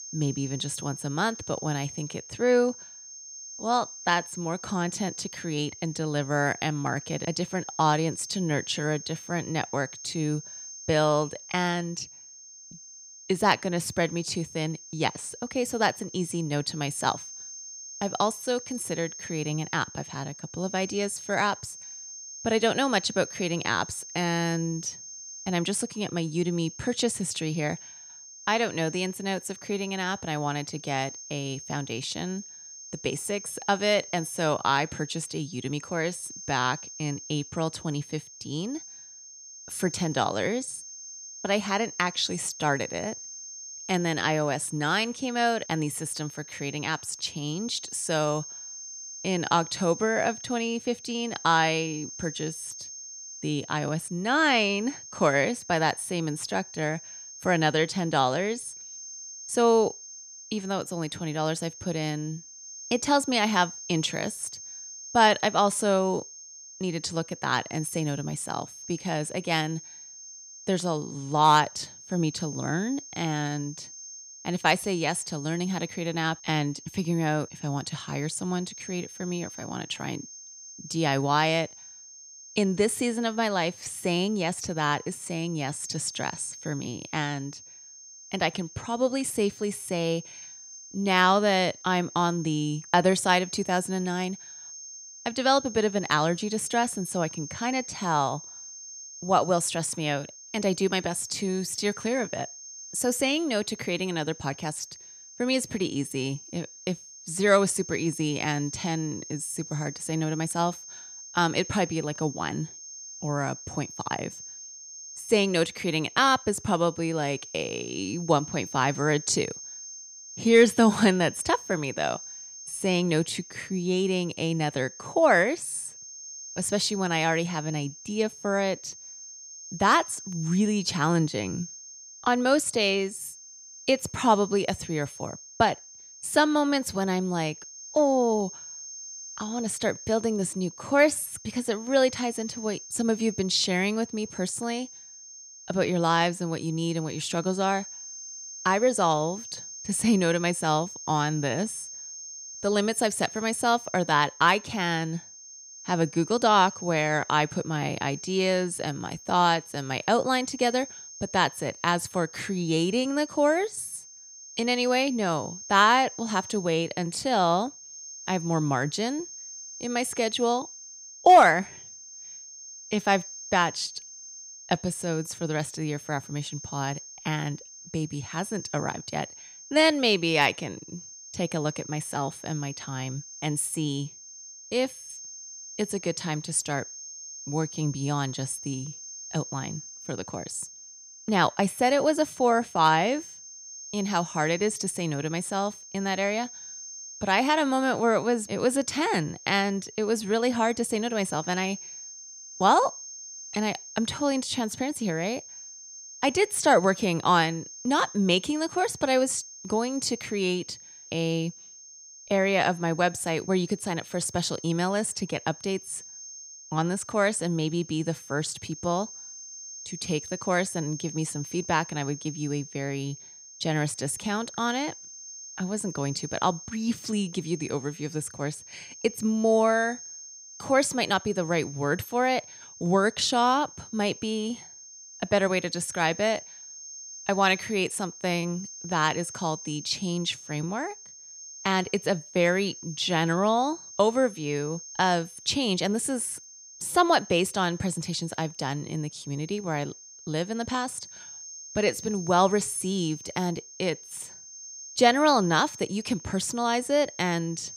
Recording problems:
high-pitched whine; noticeable; throughout; 6.5 kHz, 15 dB below the speech

